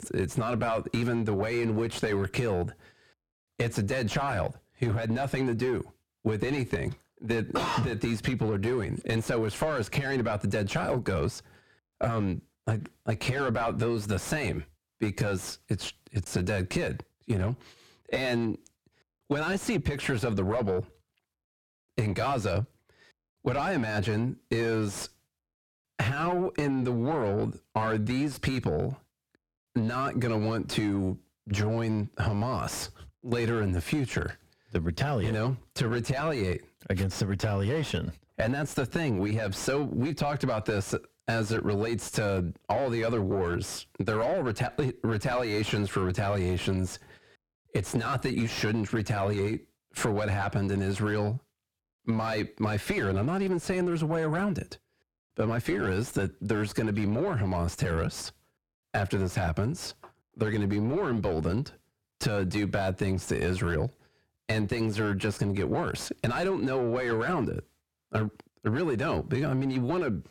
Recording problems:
distortion; heavy; 7 dB below the speech
squashed, flat; somewhat

